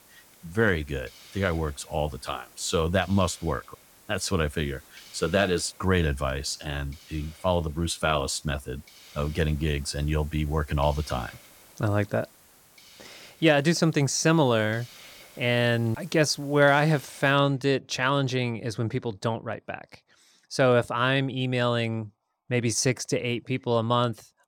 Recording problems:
hiss; faint; until 17 s; 25 dB below the speech

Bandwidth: 18 kHz